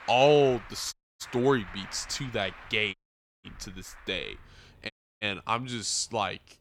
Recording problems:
traffic noise; noticeable; throughout; 20 dB below the speech
audio cutting out; at 1 s, at 3 s and at 5 s

